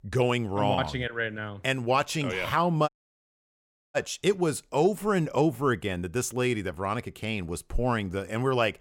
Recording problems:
audio cutting out; at 3 s for 1 s

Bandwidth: 16.5 kHz